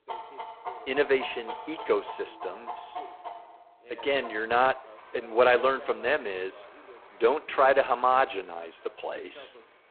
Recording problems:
phone-call audio; poor line; nothing above 4 kHz
animal sounds; noticeable; throughout; 15 dB below the speech
voice in the background; faint; throughout; 25 dB below the speech

